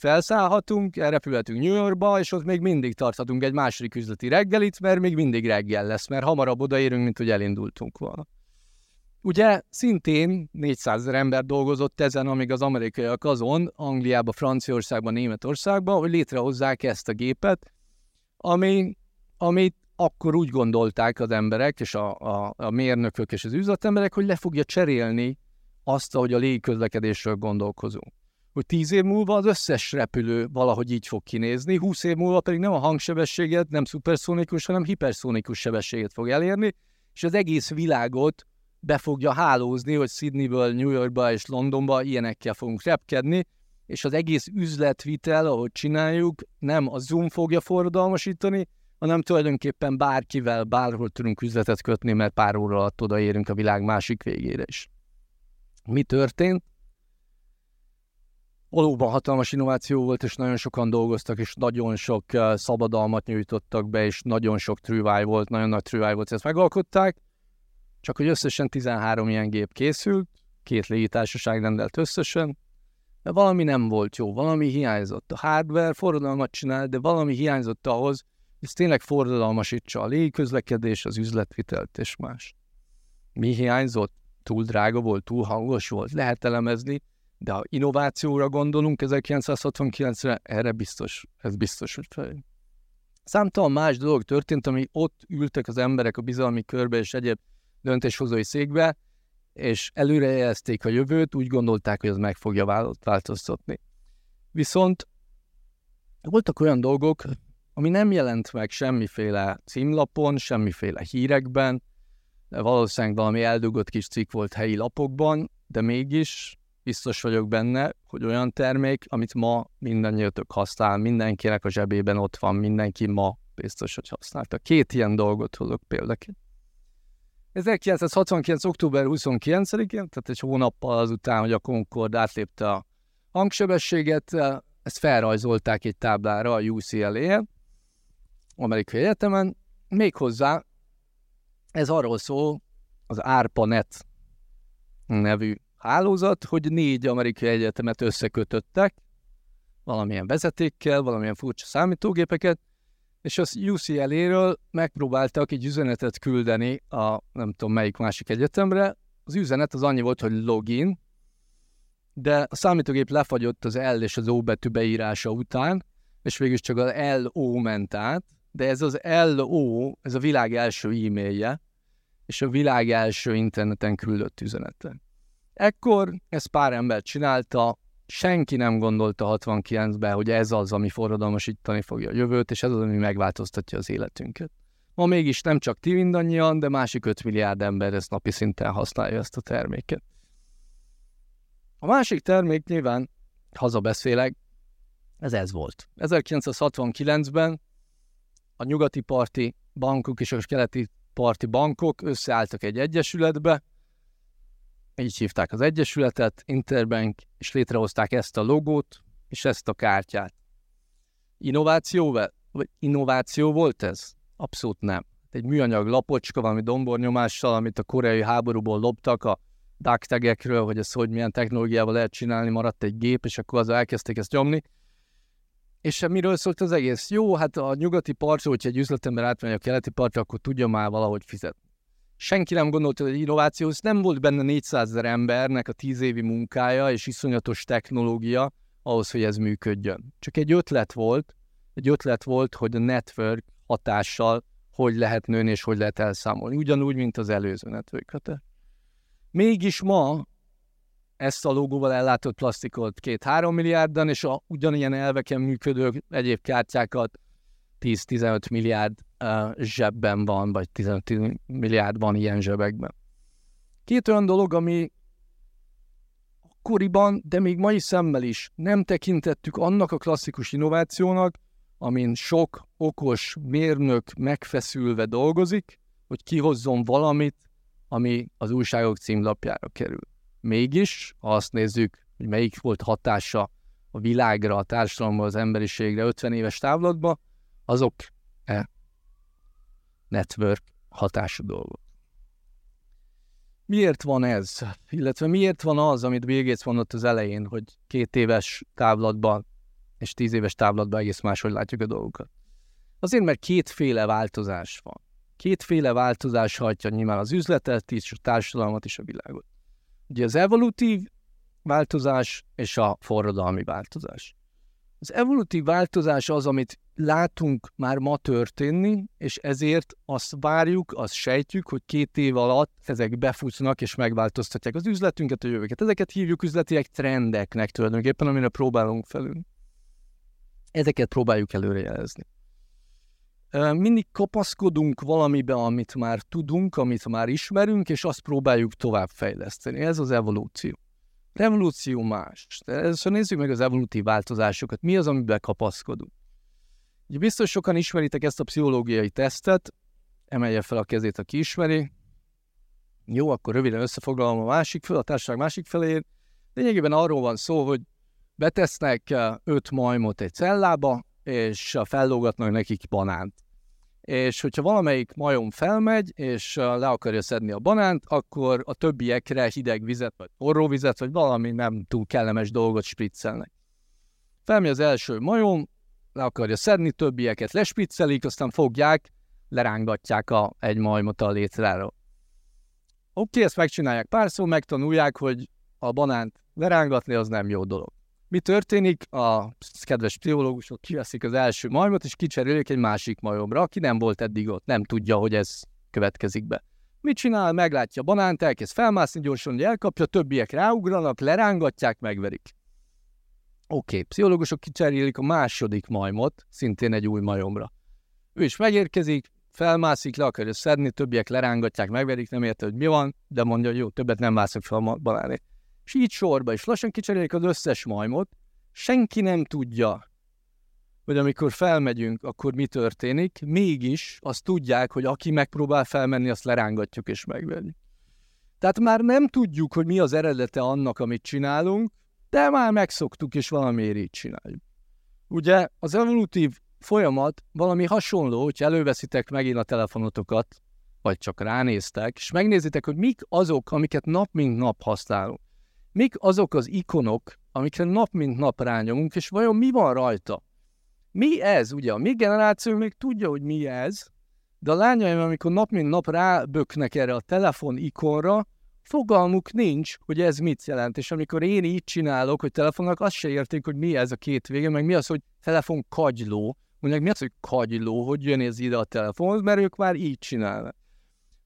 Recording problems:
none

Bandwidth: 16 kHz